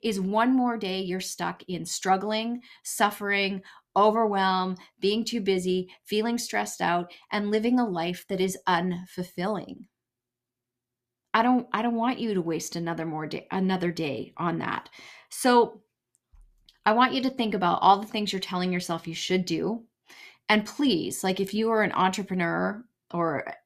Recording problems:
none

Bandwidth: 14.5 kHz